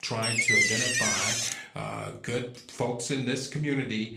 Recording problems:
room echo; slight; dies away in 0.4 s
off-mic speech; somewhat distant
garbled, watery; slightly; nothing above 15.5 kHz
thin; very slightly; fading below 400 Hz
door banging; loud; until 1.5 s; peak 10 dB above the speech

